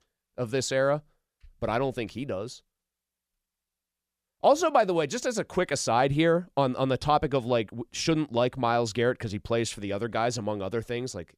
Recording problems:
none

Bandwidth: 15 kHz